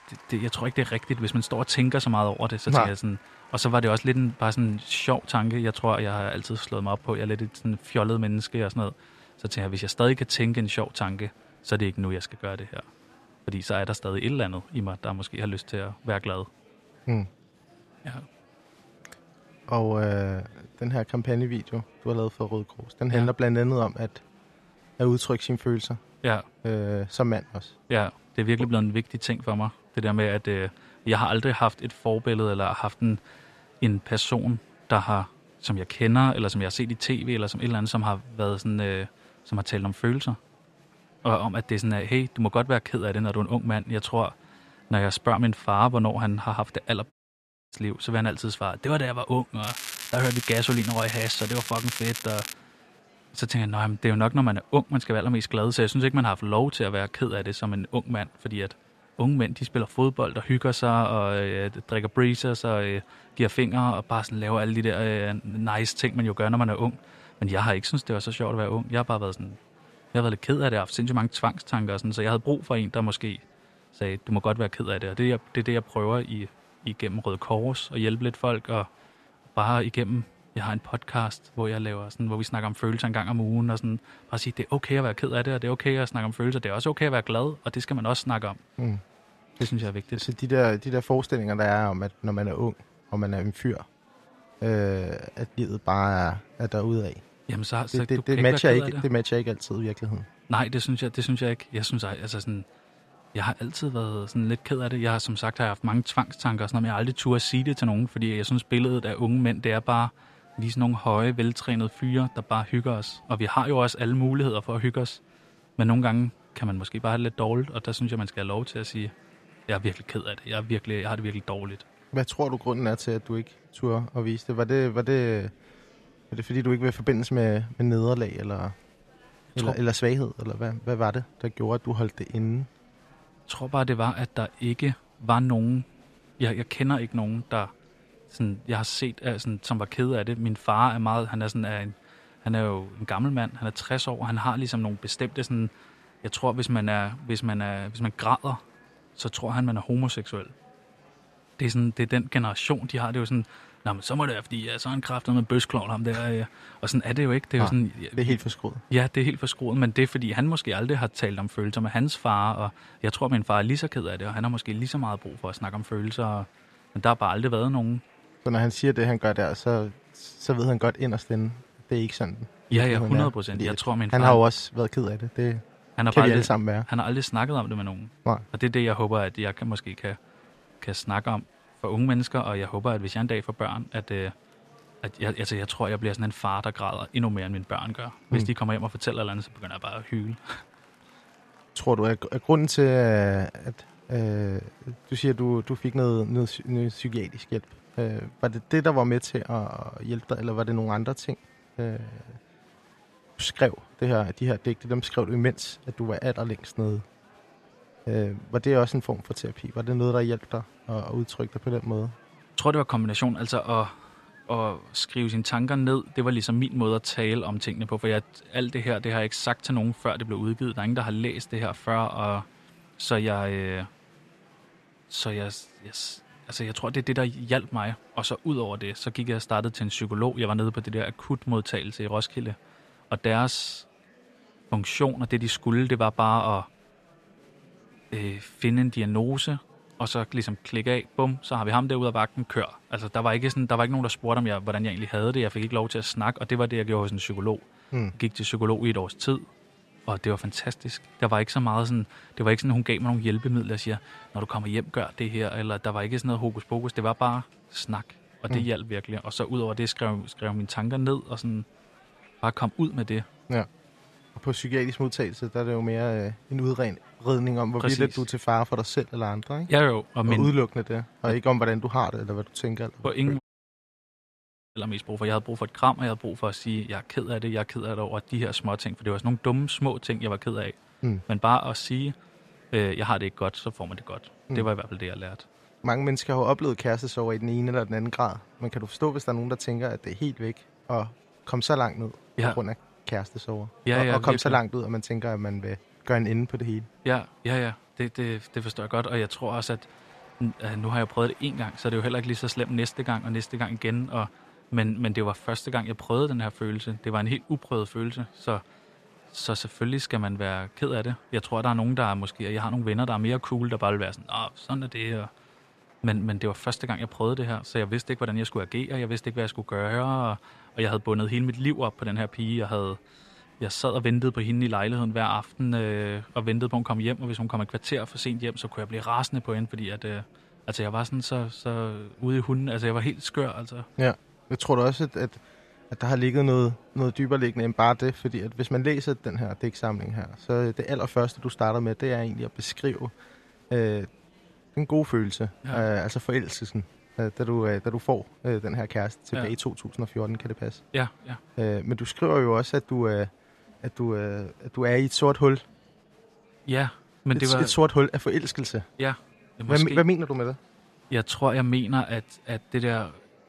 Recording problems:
crackling; loud; from 50 to 53 s; 6 dB below the speech
murmuring crowd; faint; throughout; 30 dB below the speech
audio cutting out; at 47 s for 0.5 s and at 4:33 for 1.5 s

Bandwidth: 13.5 kHz